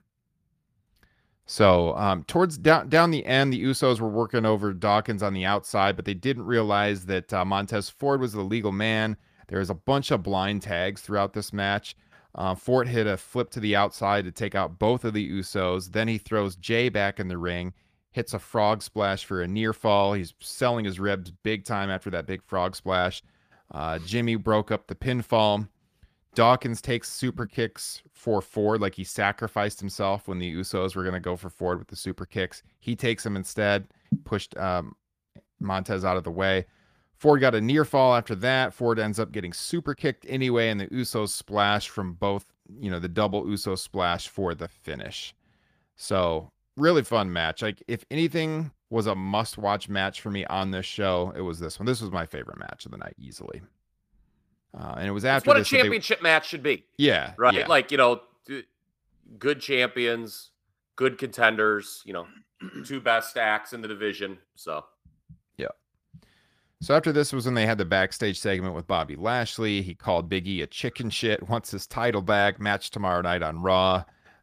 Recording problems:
none

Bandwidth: 15 kHz